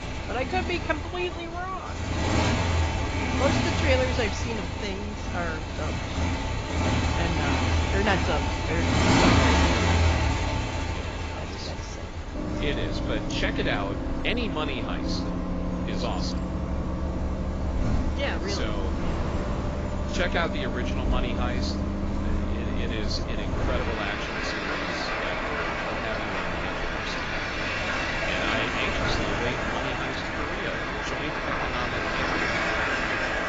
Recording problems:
garbled, watery; badly
traffic noise; very loud; throughout; 5 dB above the speech
wind noise on the microphone; occasional gusts; 10 dB below the speech

